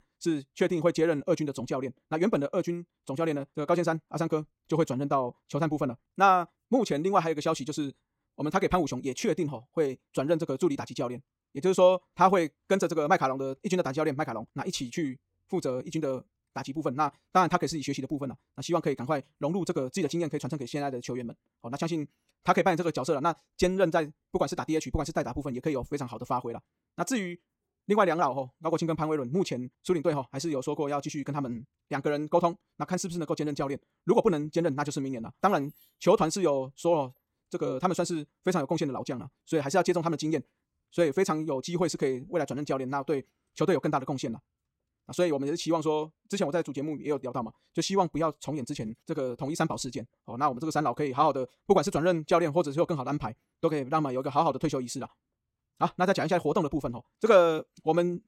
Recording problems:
wrong speed, natural pitch; too fast; 1.5 times normal speed

